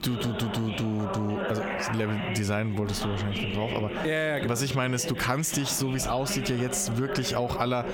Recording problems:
squashed, flat; heavily, background pumping
voice in the background; loud; throughout; 6 dB below the speech

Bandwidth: 17.5 kHz